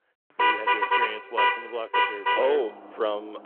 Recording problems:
phone-call audio
traffic noise; very loud; throughout; 6 dB above the speech

